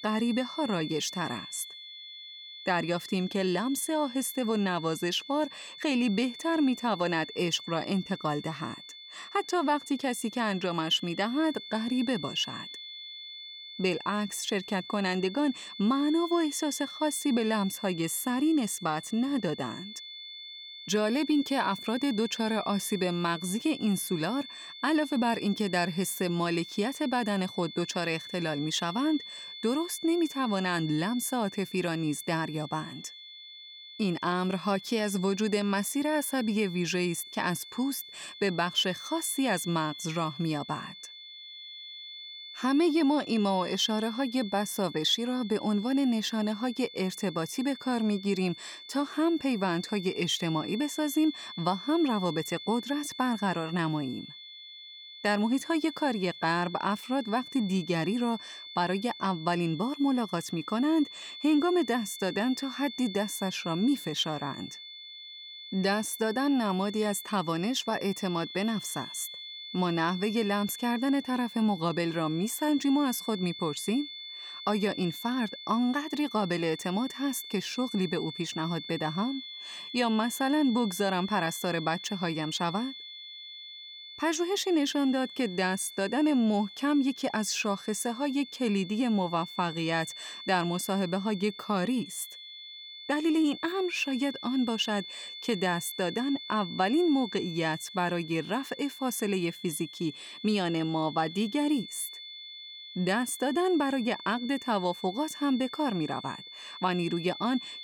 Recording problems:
high-pitched whine; noticeable; throughout; 3.5 kHz, 10 dB below the speech

